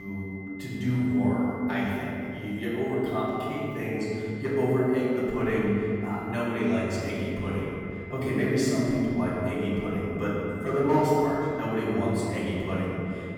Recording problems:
room echo; strong; dies away in 2.5 s
off-mic speech; far
high-pitched whine; noticeable; throughout; 2 kHz, 15 dB below the speech
abrupt cut into speech; at the start

